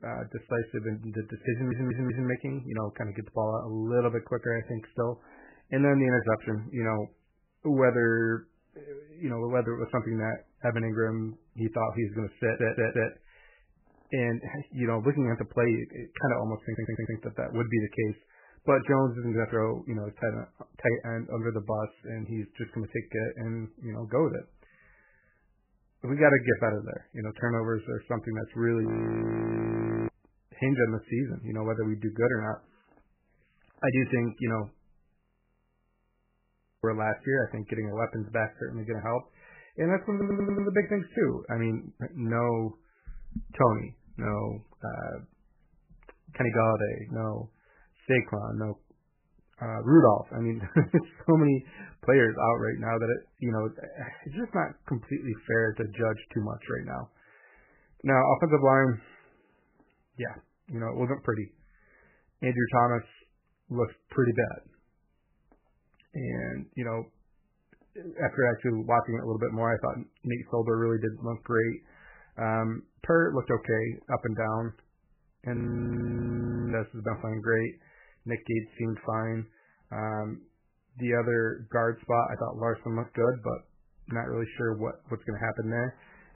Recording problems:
garbled, watery; badly; nothing above 2.5 kHz
audio stuttering; 4 times, first at 1.5 s
audio freezing; at 29 s for 1 s, at 35 s for 1.5 s and at 1:16 for 1 s

